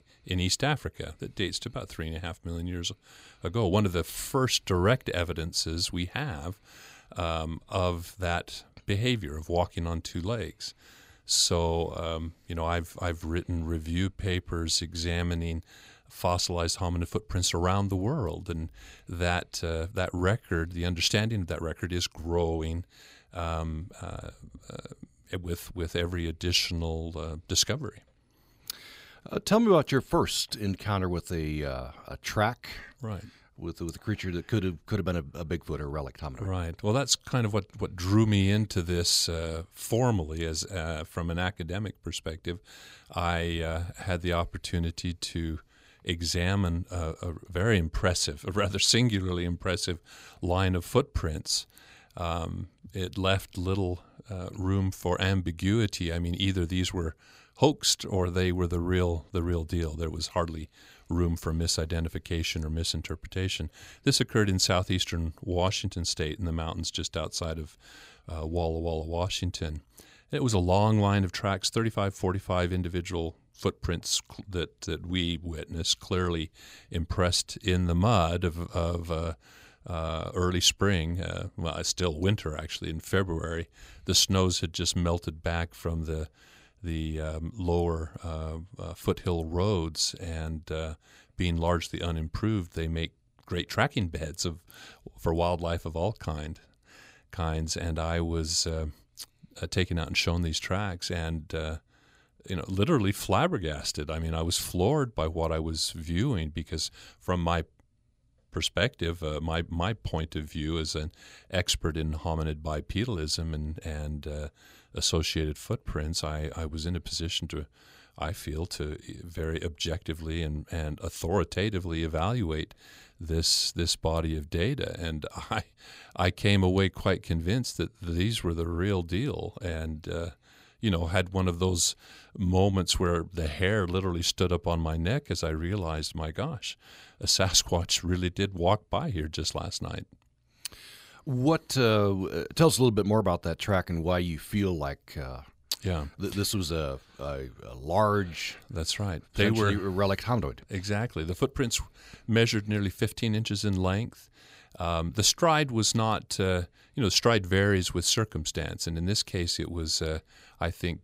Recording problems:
none

